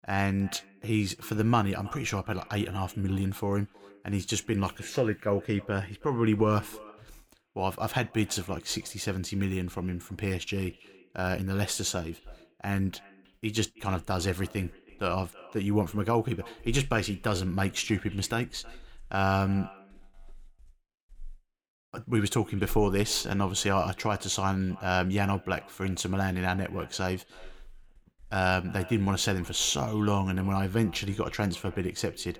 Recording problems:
echo of what is said; faint; throughout; 320 ms later, 20 dB below the speech

